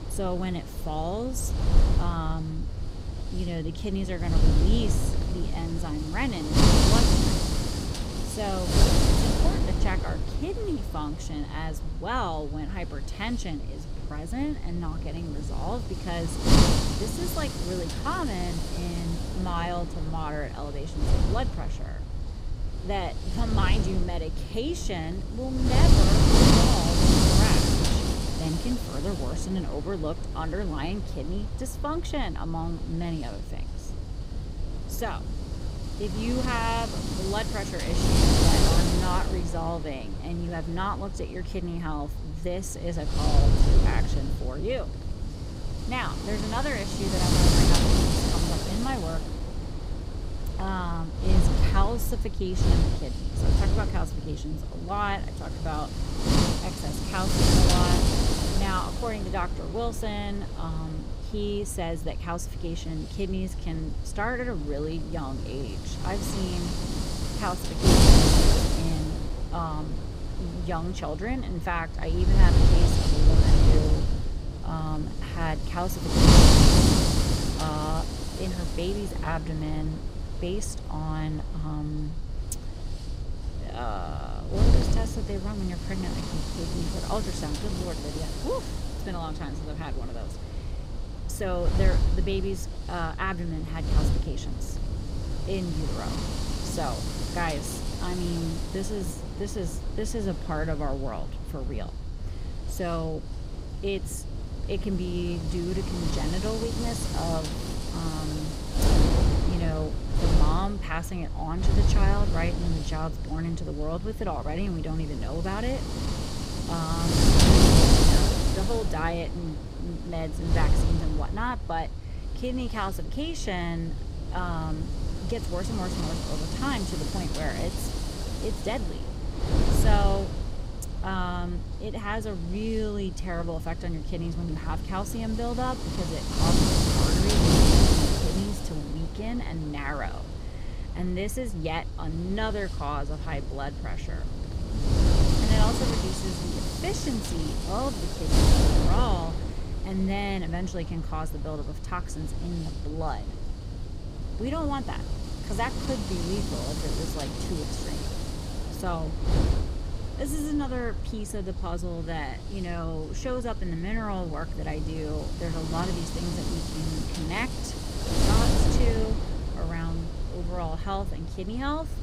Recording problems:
wind noise on the microphone; heavy; 2 dB above the speech

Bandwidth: 15.5 kHz